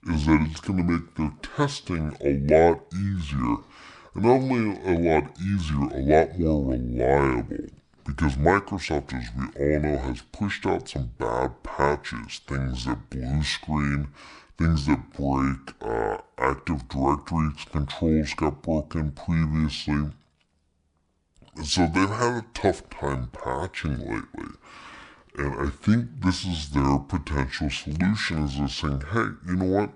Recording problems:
wrong speed and pitch; too slow and too low; 0.6 times normal speed

